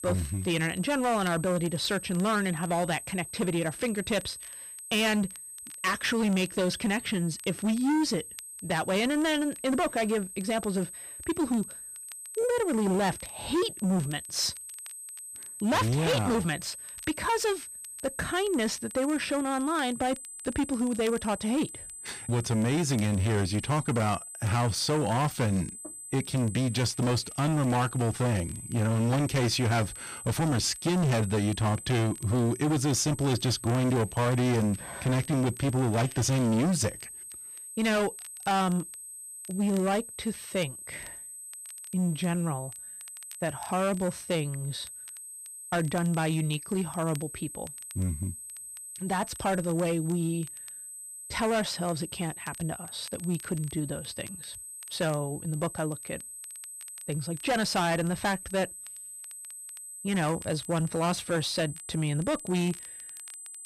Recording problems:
distortion; heavy; 14% of the sound clipped
high-pitched whine; noticeable; throughout; 8 kHz, 10 dB below the speech
crackle, like an old record; faint; 25 dB below the speech

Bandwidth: 14.5 kHz